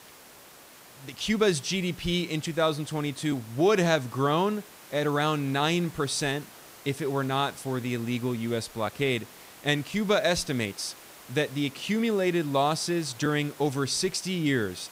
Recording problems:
hiss; noticeable; throughout; 20 dB below the speech

